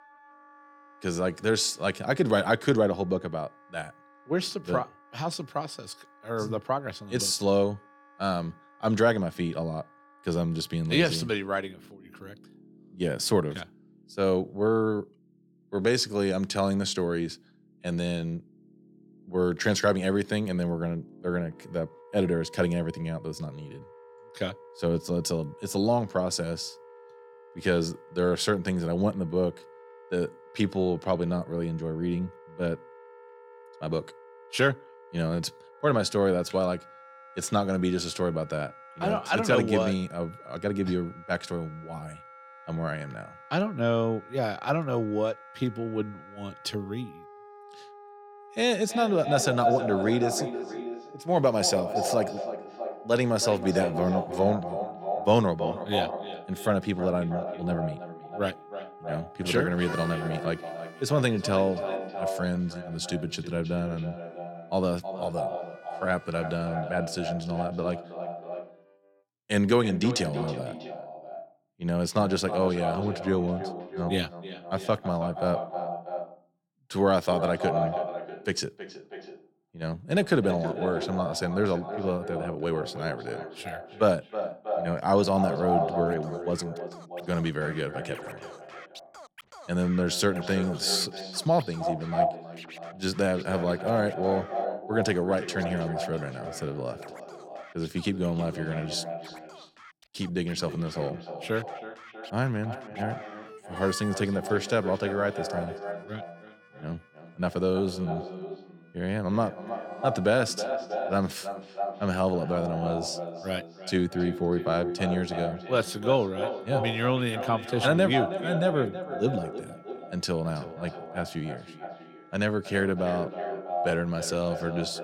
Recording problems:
echo of what is said; strong; from 48 s on; 320 ms later, 7 dB below the speech
background music; faint; throughout; 20 dB below the speech

